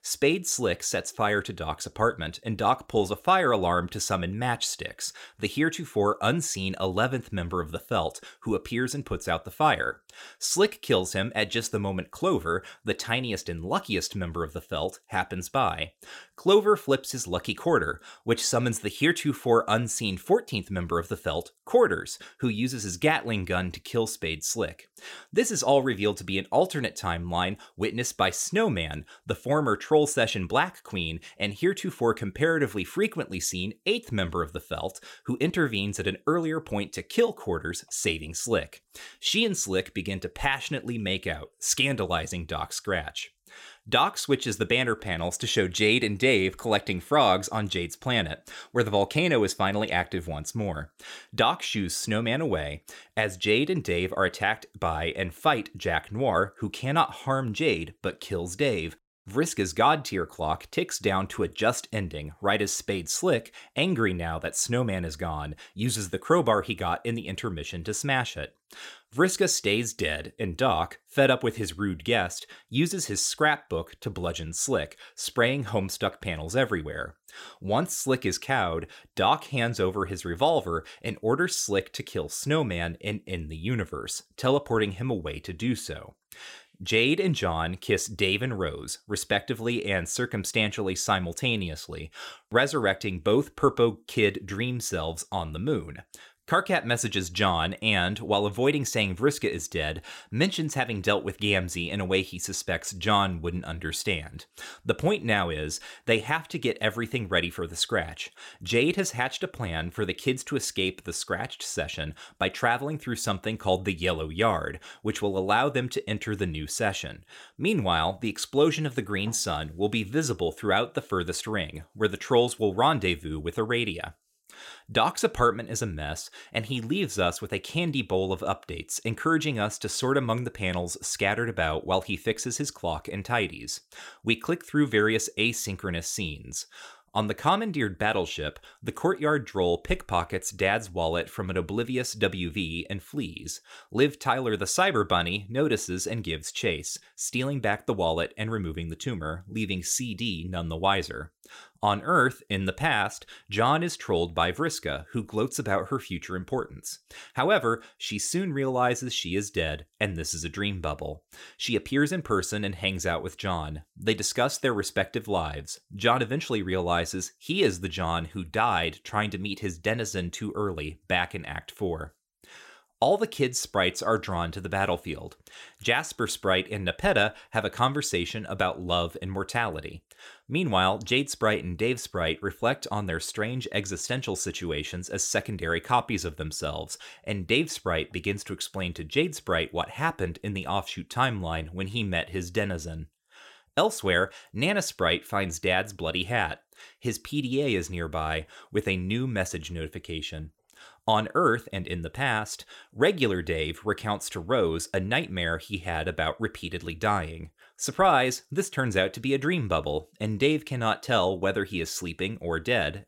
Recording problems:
none

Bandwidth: 16.5 kHz